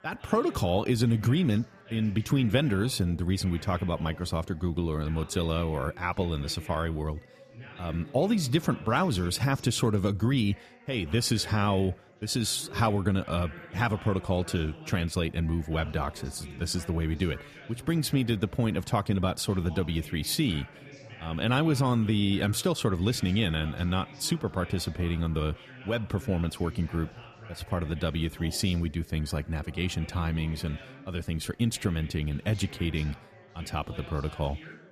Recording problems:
chatter from many people; noticeable; throughout; 20 dB below the speech

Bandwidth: 14.5 kHz